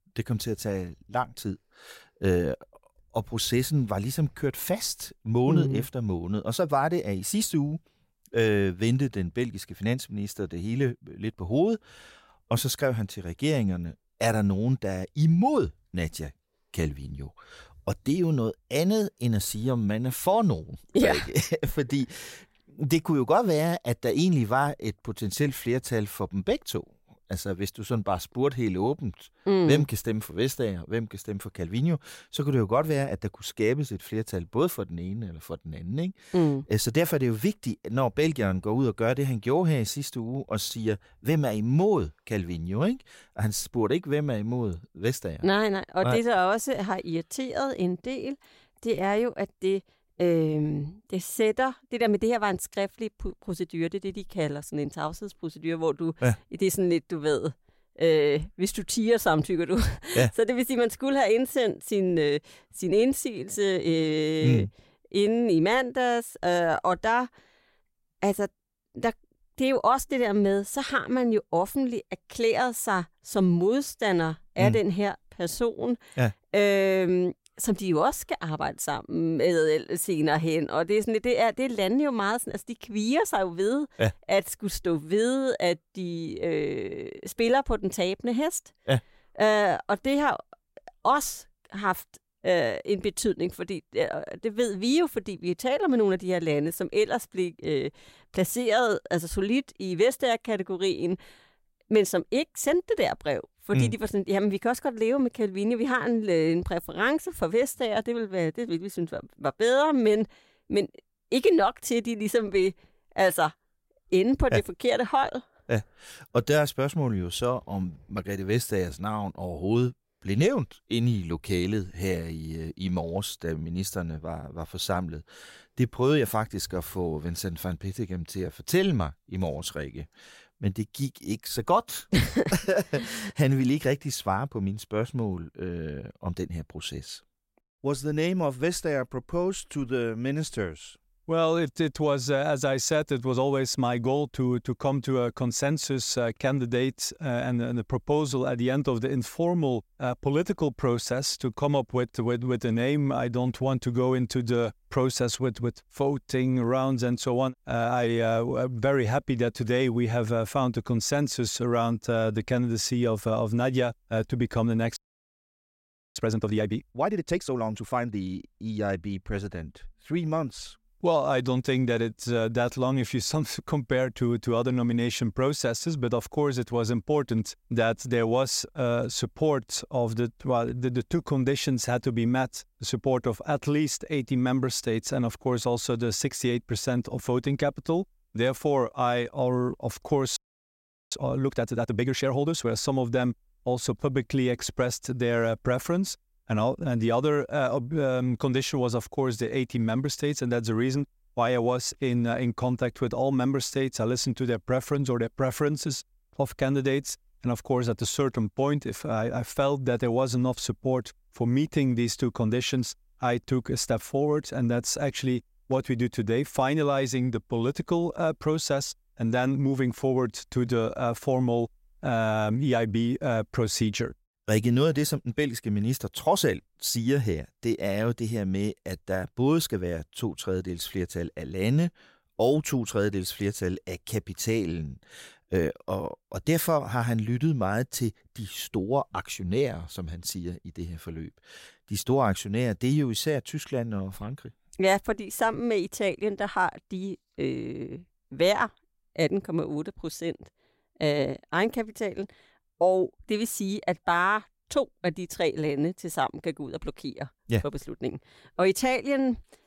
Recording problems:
audio freezing; at 2:45 for 1 s and at 3:10 for 1 s

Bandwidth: 16 kHz